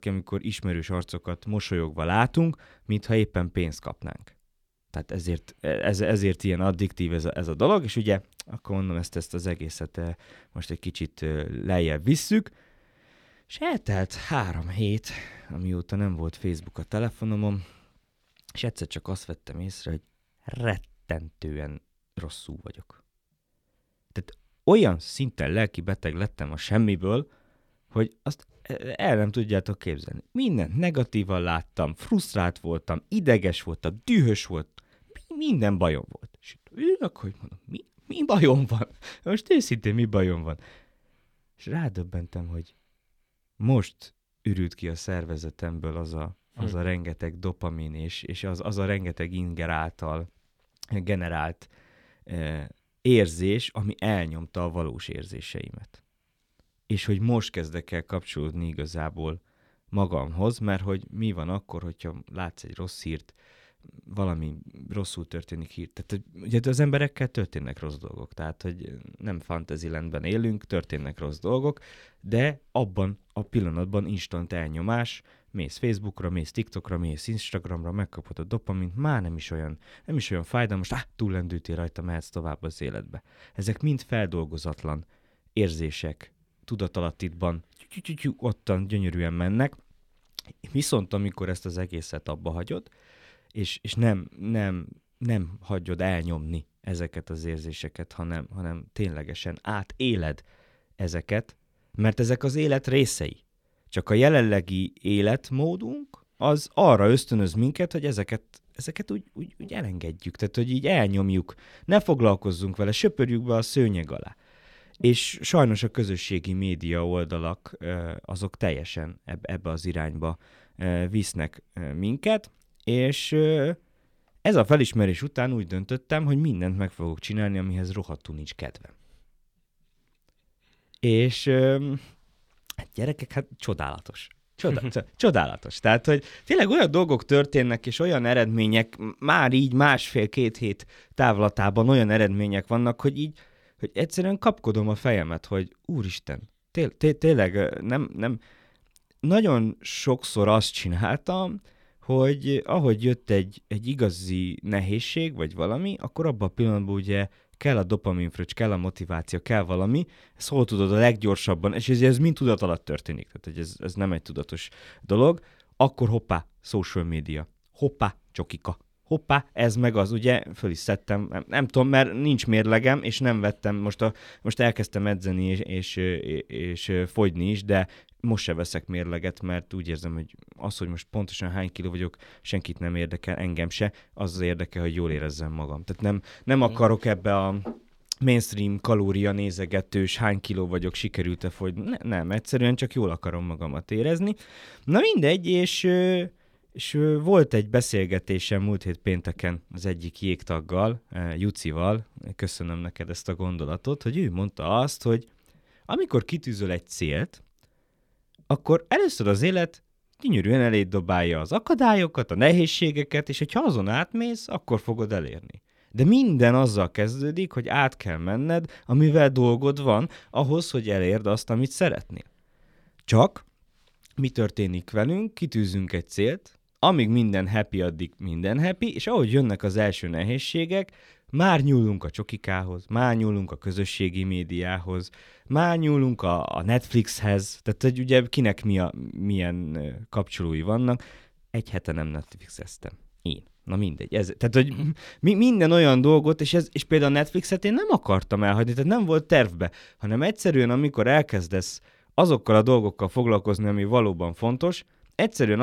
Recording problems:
abrupt cut into speech; at the end

